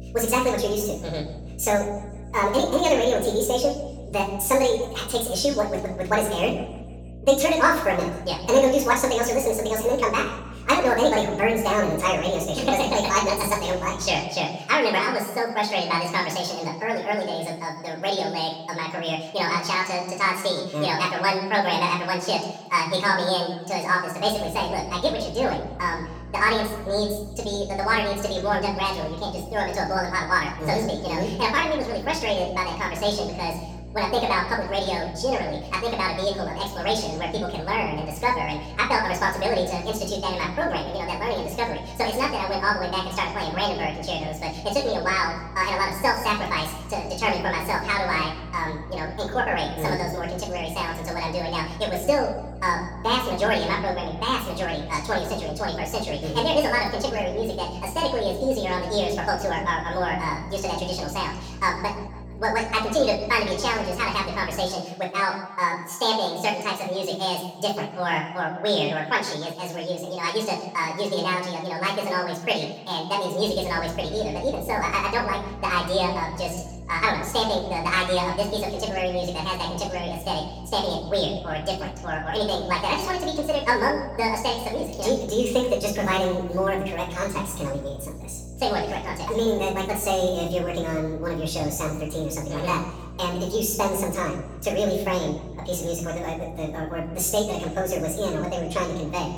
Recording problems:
off-mic speech; far
wrong speed and pitch; too fast and too high; 1.7 times normal speed
room echo; slight; dies away in 0.9 s
electrical hum; faint; until 14 s, from 24 s to 1:05 and from 1:13 on; 60 Hz, 25 dB below the speech

